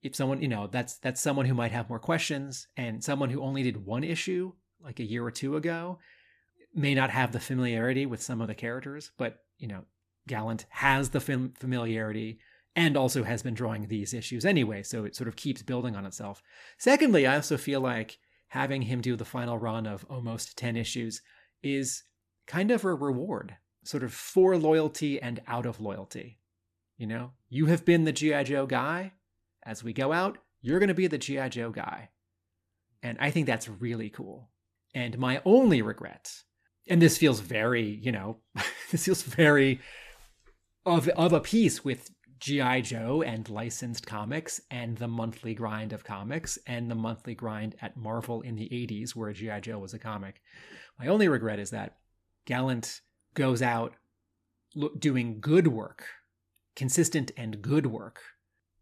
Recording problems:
none

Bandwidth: 14.5 kHz